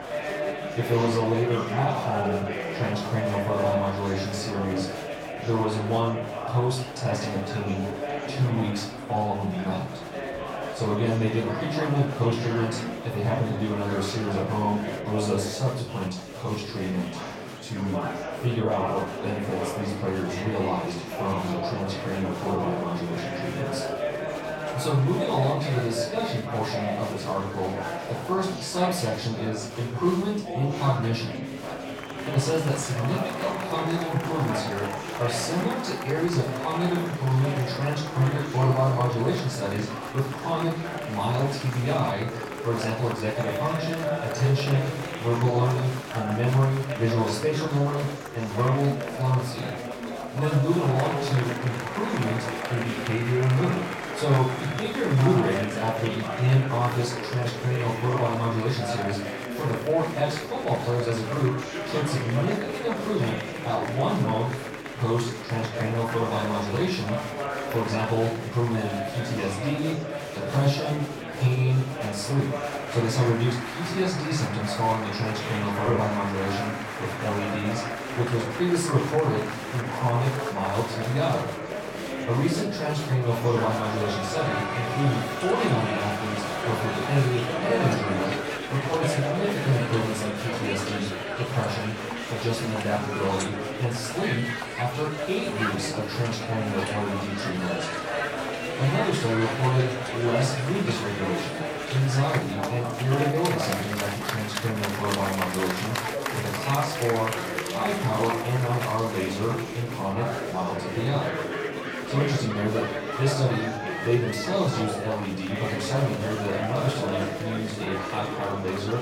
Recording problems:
off-mic speech; far
room echo; noticeable; dies away in 0.4 s
murmuring crowd; loud; throughout; 4 dB below the speech

